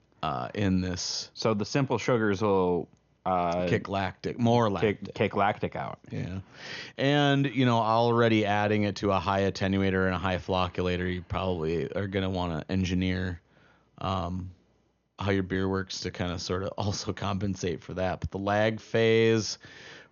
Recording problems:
high frequencies cut off; noticeable; nothing above 6.5 kHz

